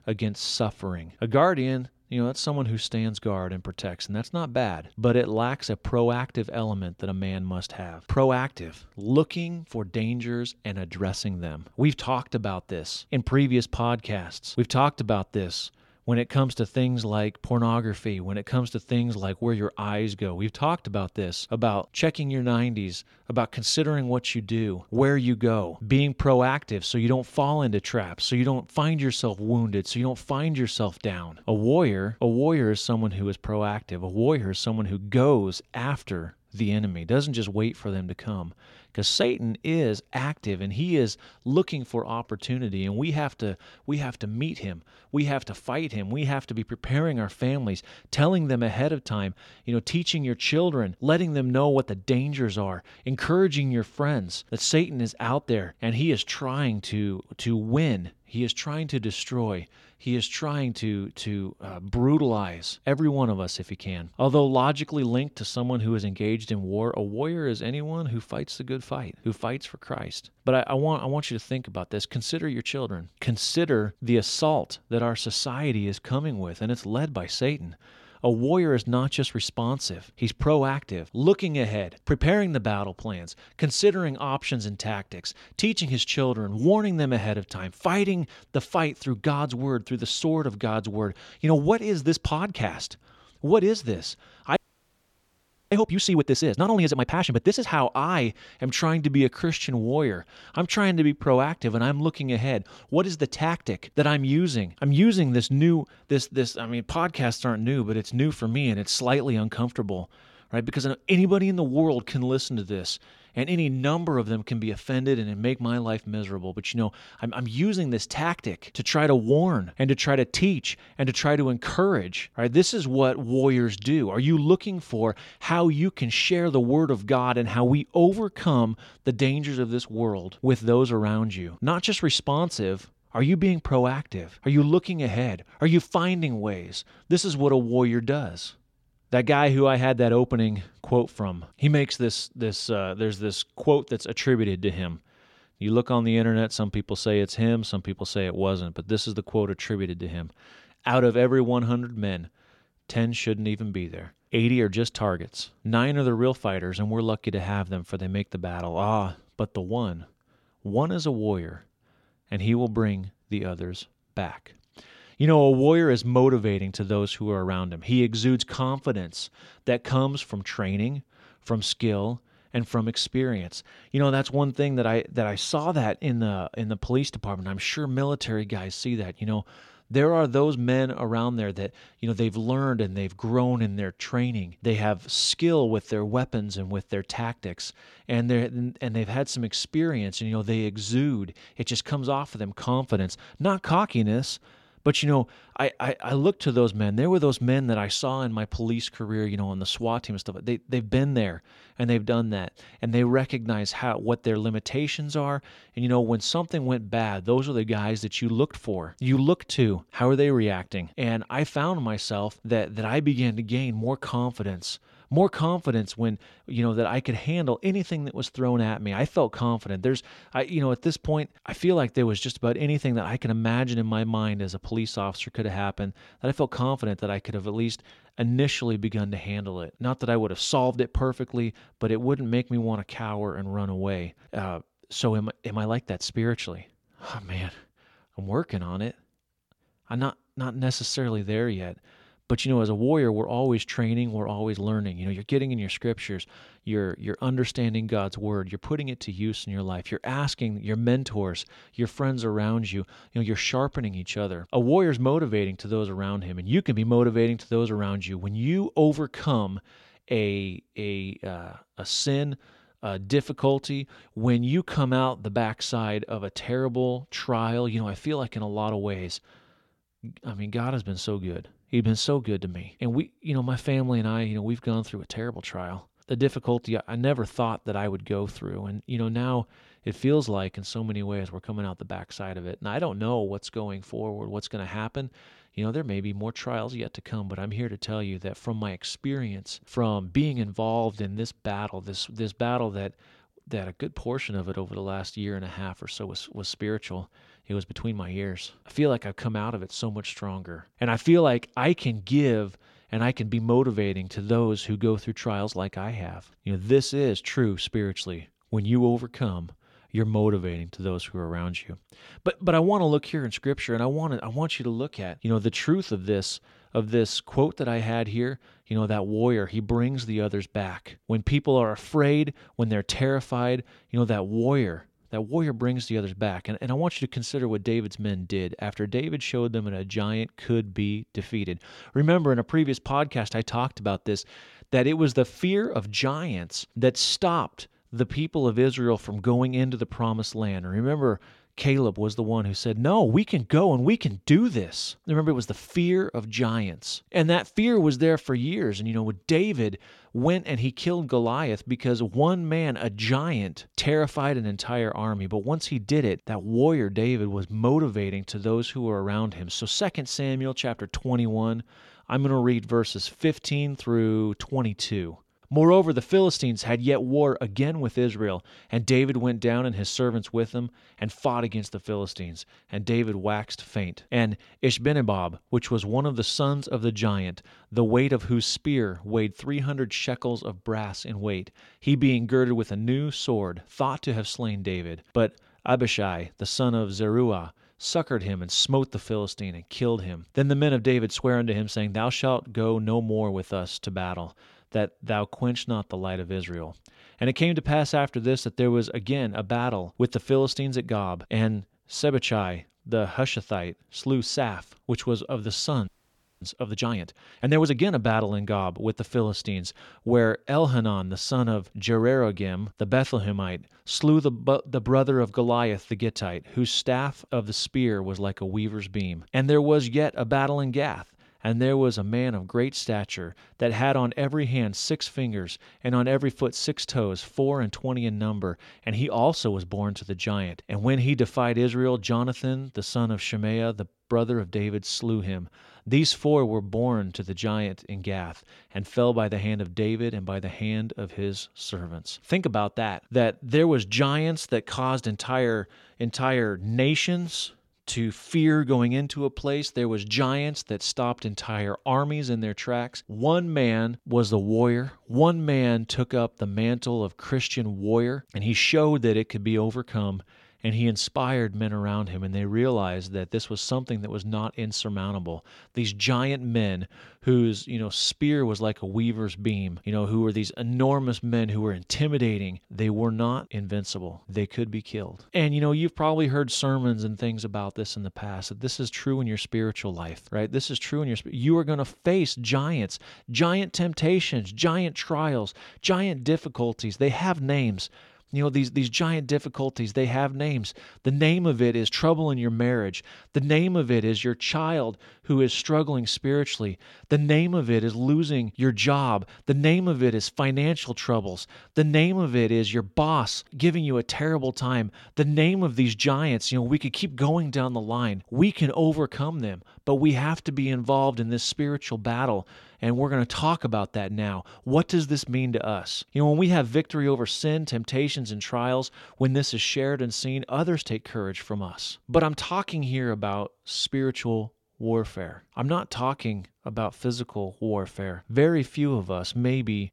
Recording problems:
audio freezing; at 1:35 for 1 s and at 6:46 for 0.5 s

